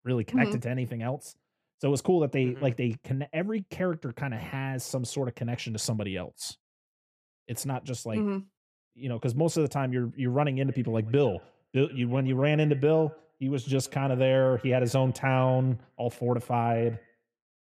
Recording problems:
echo of what is said; faint; from 11 s on; 120 ms later, 25 dB below the speech

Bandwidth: 15 kHz